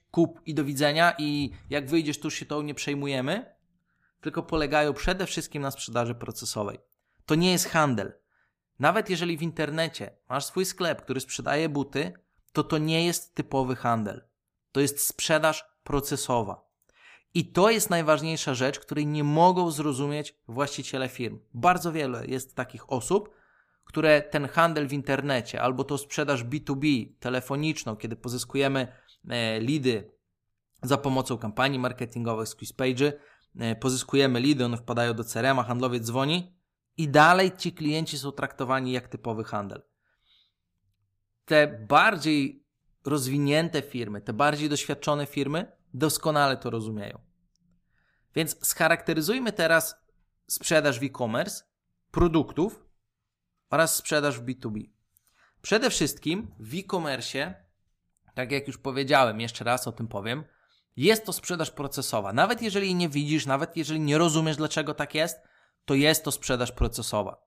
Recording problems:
none

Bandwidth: 15 kHz